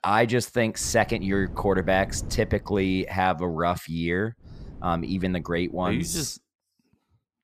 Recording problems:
wind noise on the microphone; occasional gusts; from 1 to 3 s and from 4.5 to 6 s; 25 dB below the speech

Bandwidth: 14.5 kHz